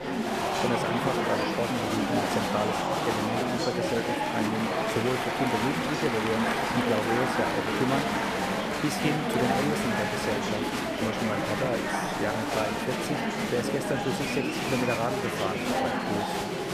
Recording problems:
murmuring crowd; very loud; throughout; 4 dB above the speech

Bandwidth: 14.5 kHz